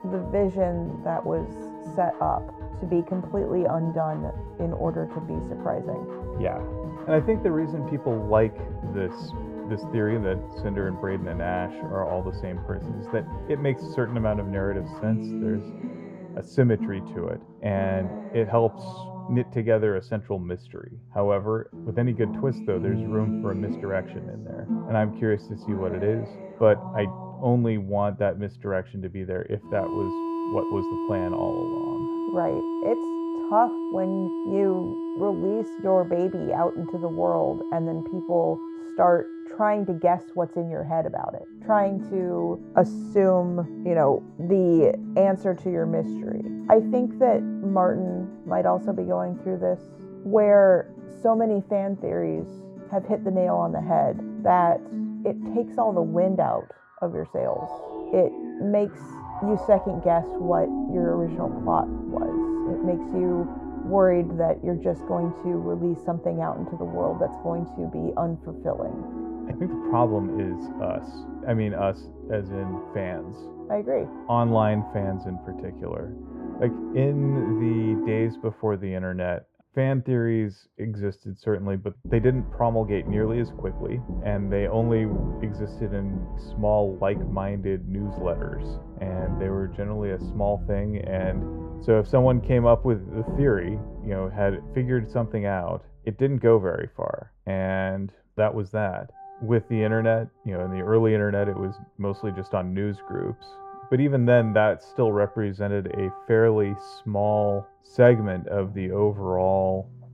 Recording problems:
muffled; very; fading above 2 kHz
background music; loud; throughout; 9 dB below the speech

